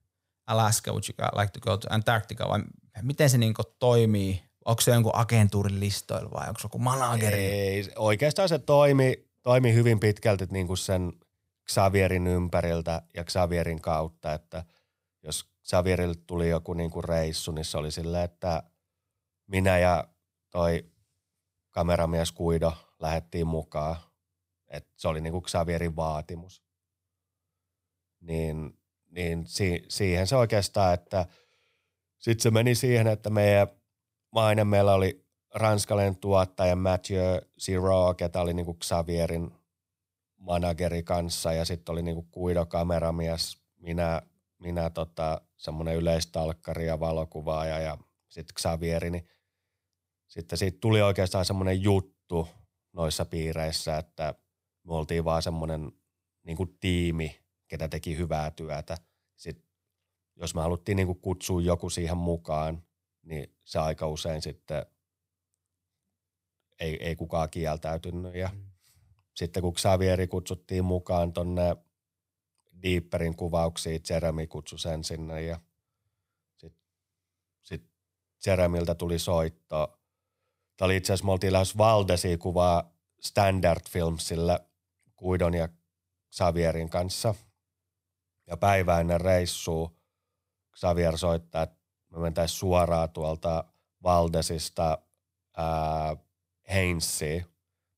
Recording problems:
none

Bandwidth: 15.5 kHz